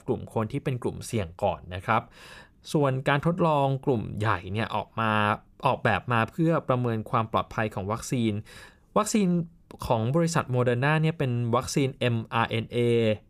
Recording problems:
none

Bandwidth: 15 kHz